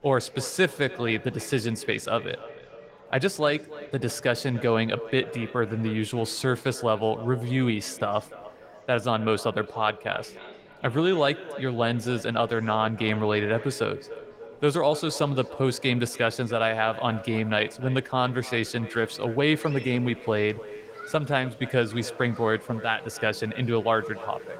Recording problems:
echo of what is said; noticeable; throughout; 290 ms later, 15 dB below the speech
garbled, watery; slightly; nothing above 16 kHz
murmuring crowd; faint; throughout; 25 dB below the speech

